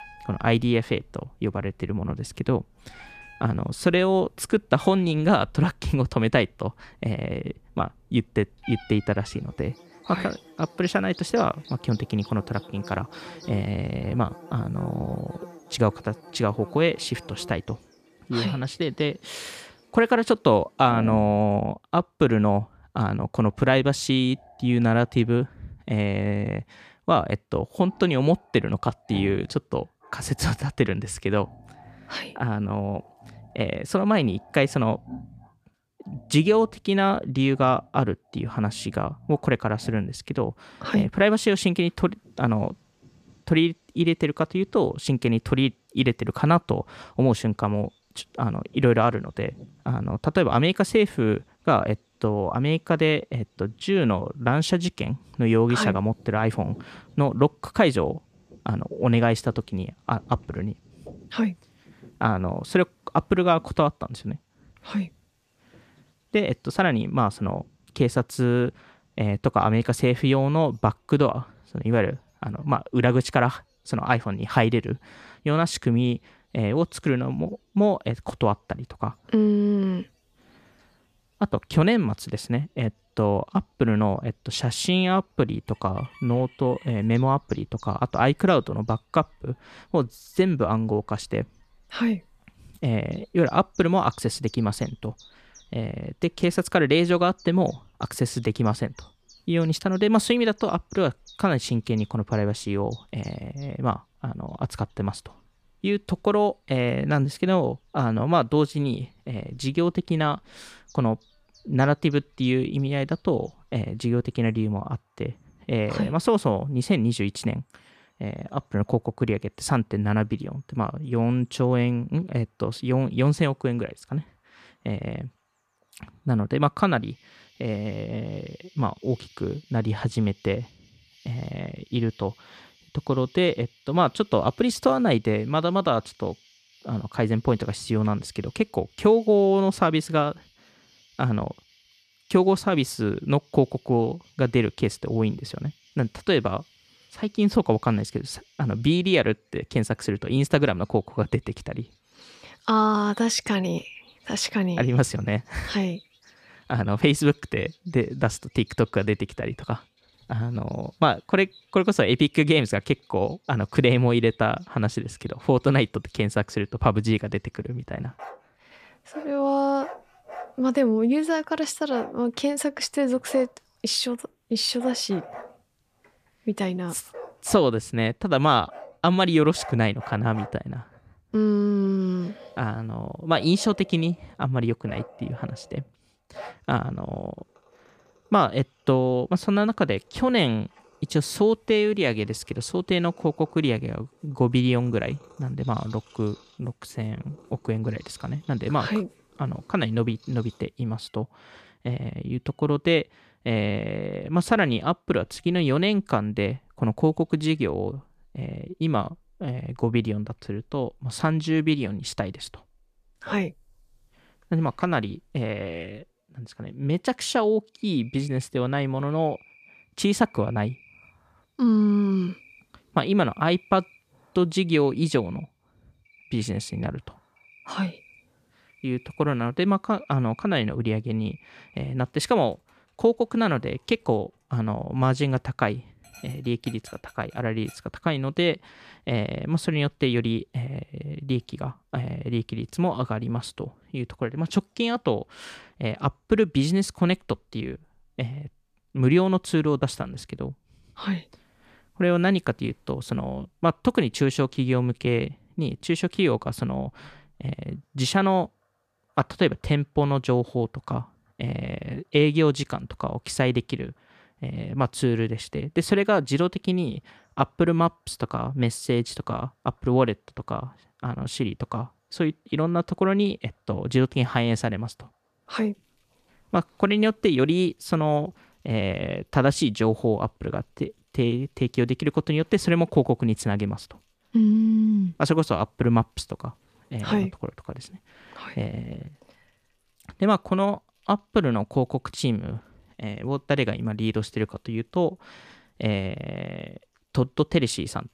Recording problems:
animal sounds; faint; throughout; 25 dB below the speech

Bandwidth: 14.5 kHz